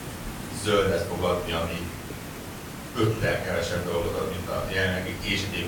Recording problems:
off-mic speech; far
room echo; noticeable; dies away in 0.5 s
hiss; loud; throughout; 9 dB below the speech
murmuring crowd; faint; throughout; 30 dB below the speech

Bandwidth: 18 kHz